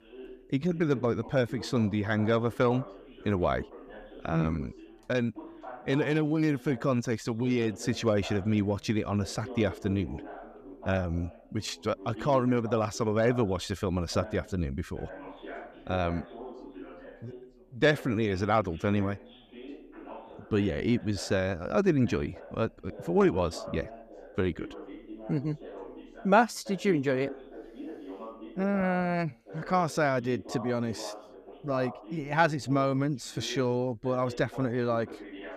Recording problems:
background chatter; noticeable; throughout; 2 voices, 15 dB below the speech

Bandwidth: 14.5 kHz